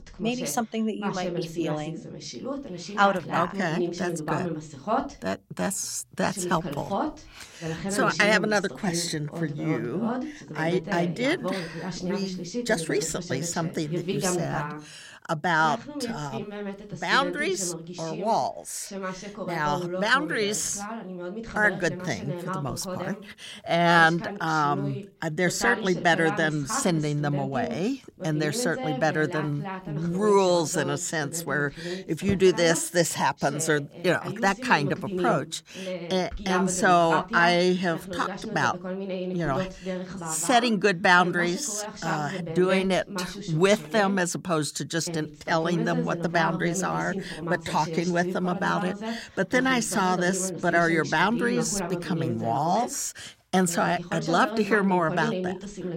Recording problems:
voice in the background; loud; throughout; 8 dB below the speech

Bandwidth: 16 kHz